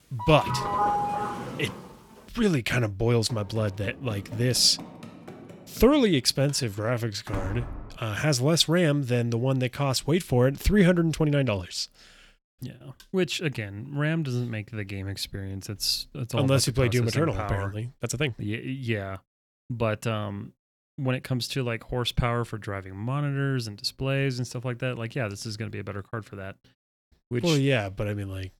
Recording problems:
doorbell; loud; until 2 s; peak 1 dB above the speech
uneven, jittery; strongly; from 3 to 28 s
door banging; noticeable; from 3.5 to 8 s; peak 9 dB below the speech

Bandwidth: 18 kHz